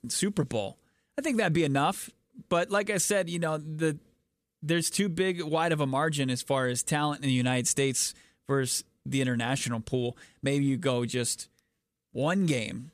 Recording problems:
none

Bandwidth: 14.5 kHz